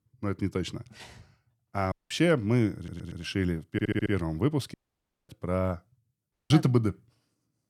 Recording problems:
audio cutting out; at 2 s, at 4.5 s for 0.5 s and at 6.5 s
audio stuttering; at 3 s and at 3.5 s

